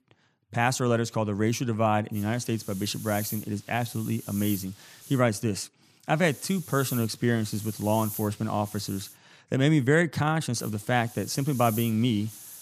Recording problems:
hiss; noticeable; from 2 to 5 s, from 6 to 9 s and from 11 s on; 15 dB below the speech

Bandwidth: 14.5 kHz